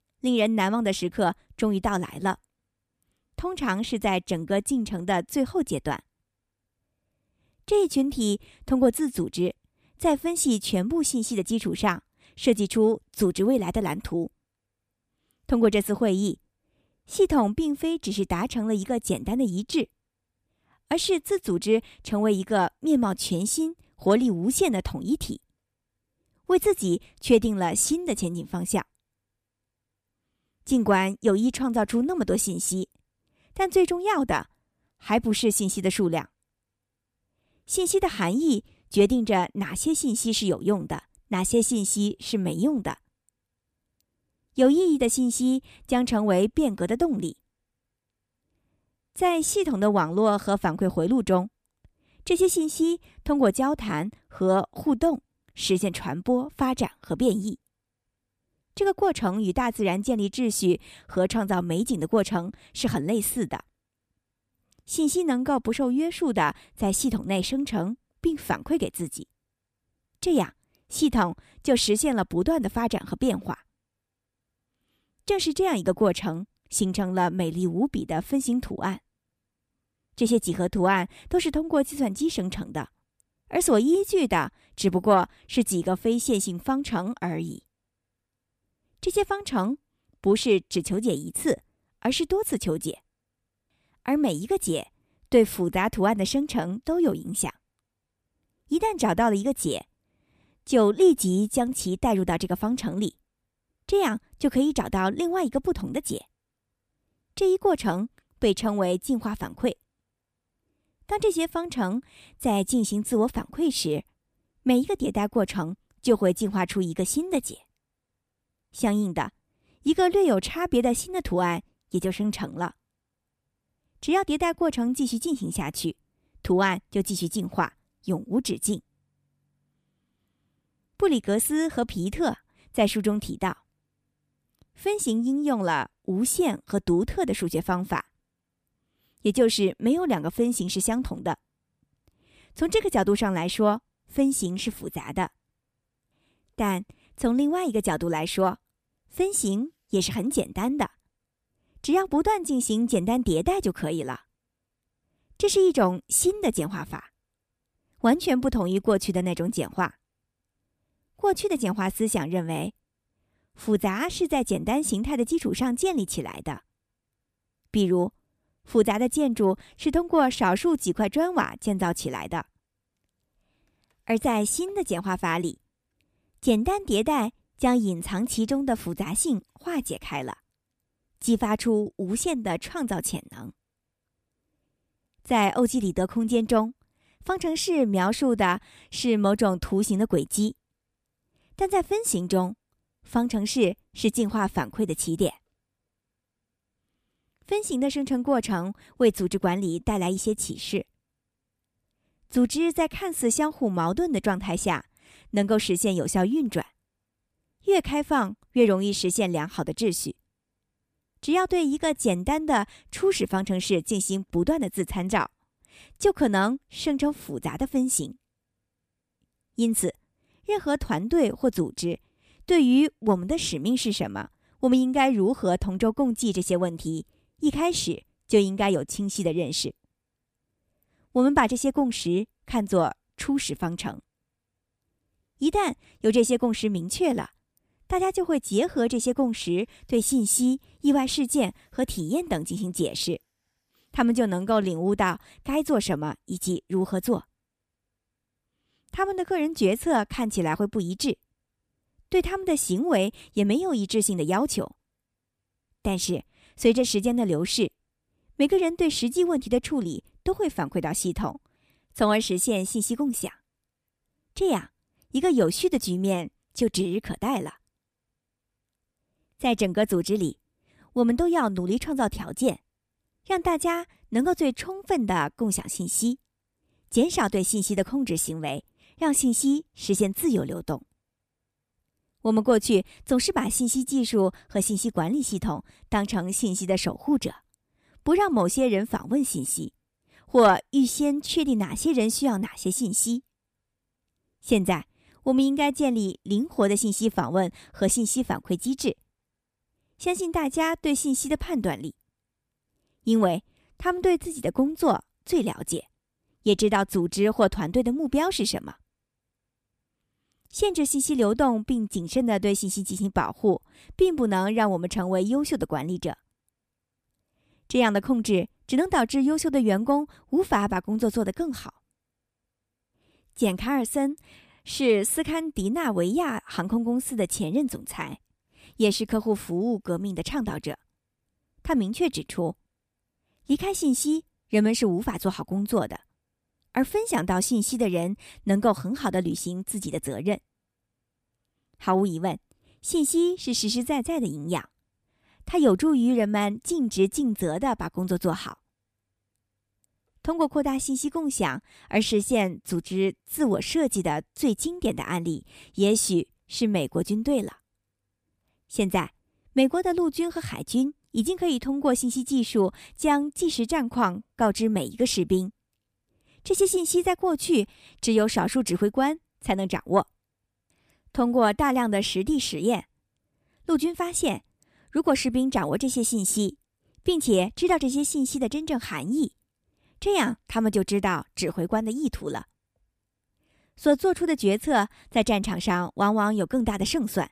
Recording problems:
none

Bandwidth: 14.5 kHz